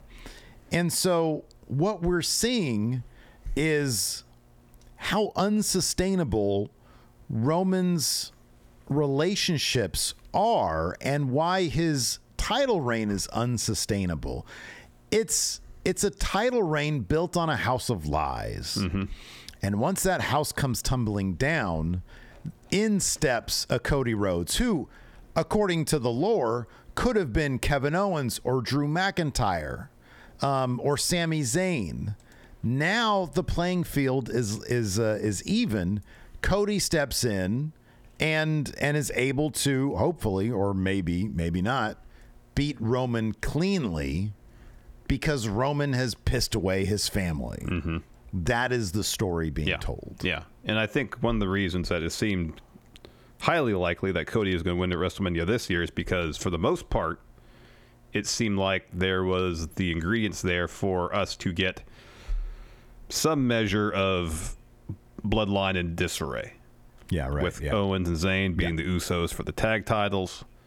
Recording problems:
squashed, flat; heavily

